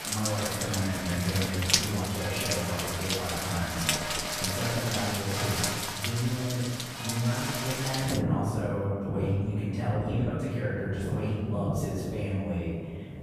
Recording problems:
room echo; strong; dies away in 1.5 s
off-mic speech; far
rain or running water; very loud; throughout; as loud as the speech

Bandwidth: 14.5 kHz